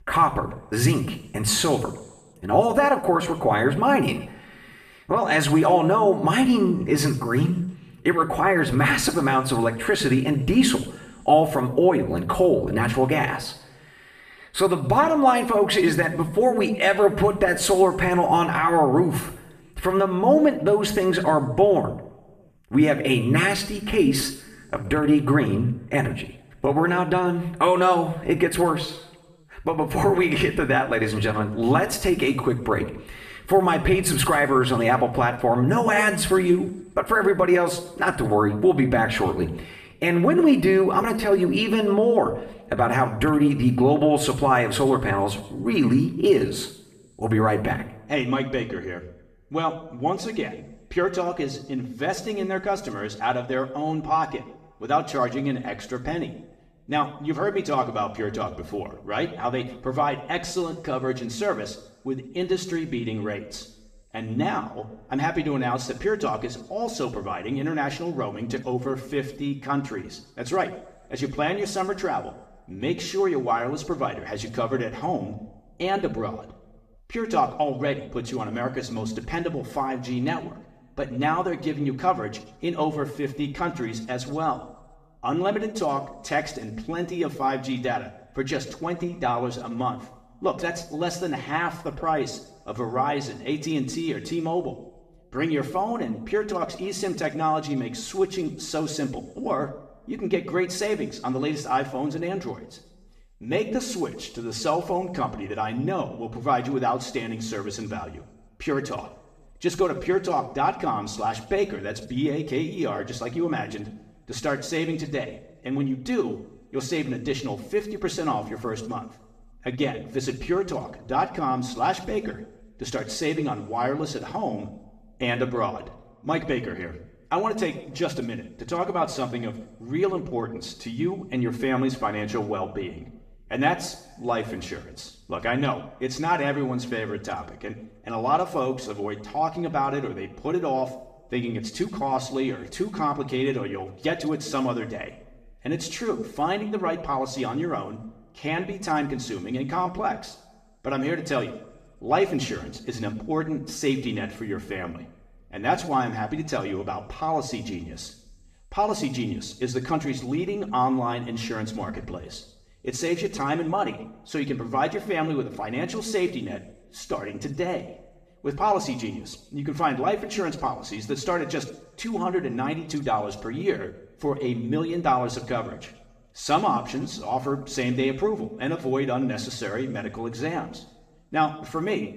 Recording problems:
room echo; slight; dies away in 0.8 s
off-mic speech; somewhat distant

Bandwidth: 14.5 kHz